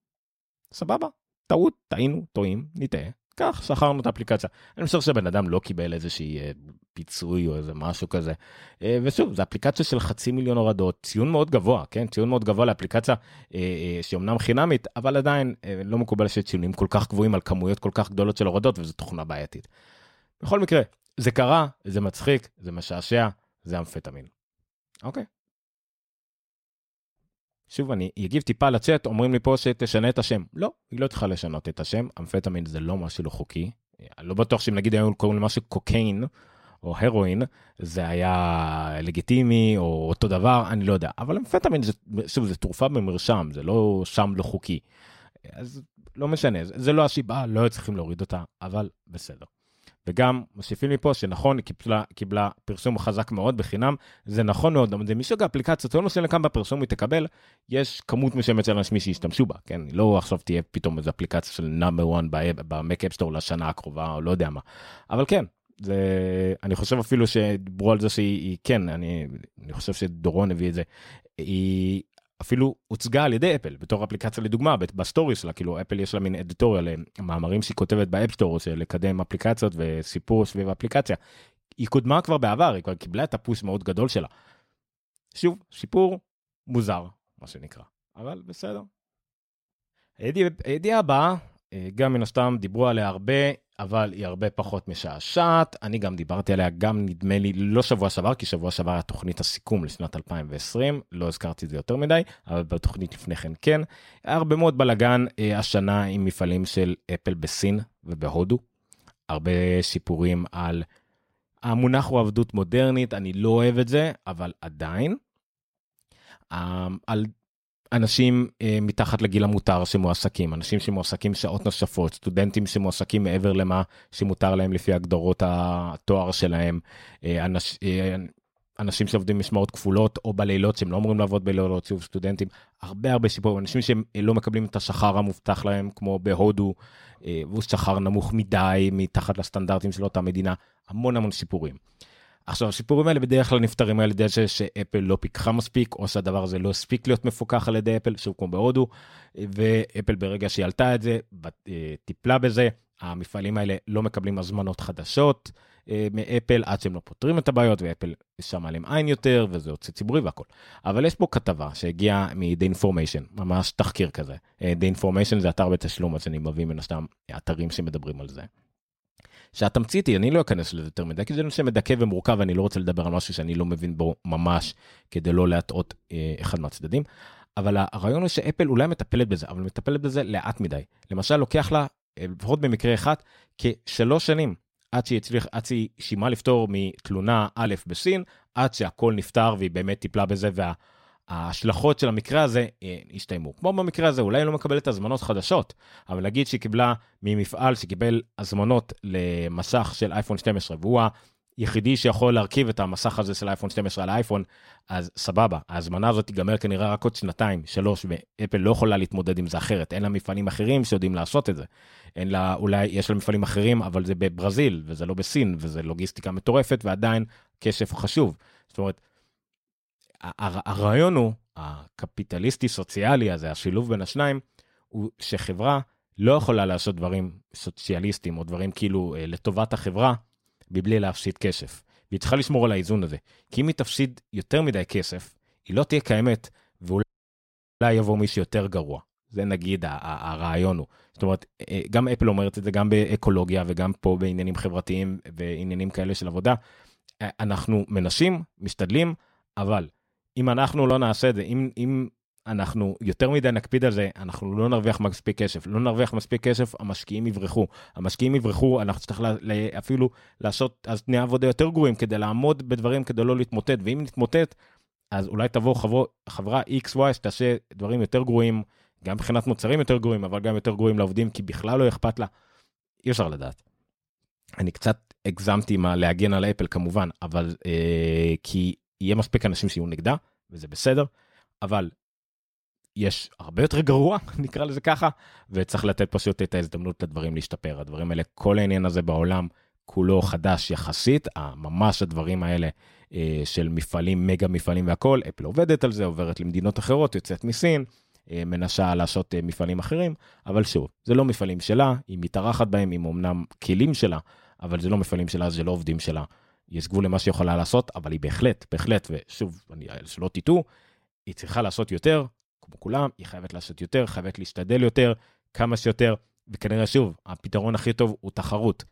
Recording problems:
audio cutting out; at 3:57 for 1 s

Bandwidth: 16 kHz